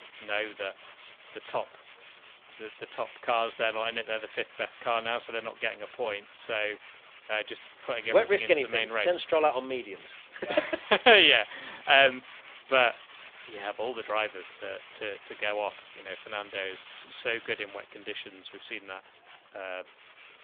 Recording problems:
phone-call audio; nothing above 3.5 kHz
machinery noise; faint; throughout; 20 dB below the speech

